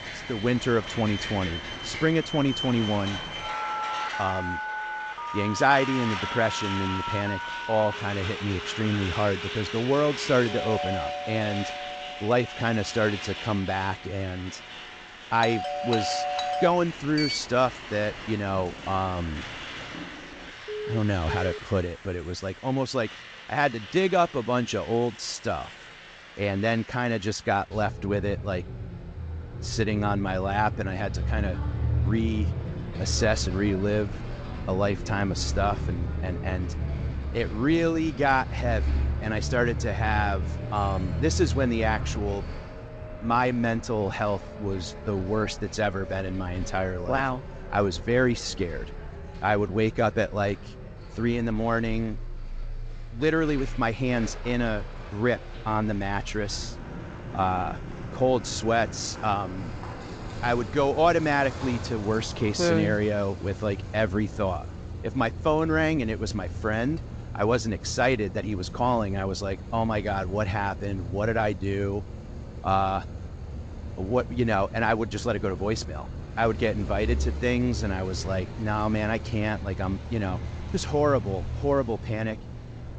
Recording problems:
garbled, watery; slightly; nothing above 7.5 kHz
alarms or sirens; loud; until 22 s; 8 dB below the speech
traffic noise; loud; throughout; 9 dB below the speech

